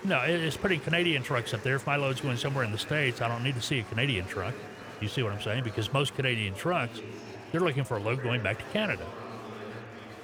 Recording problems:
chatter from many people; noticeable; throughout; 15 dB below the speech

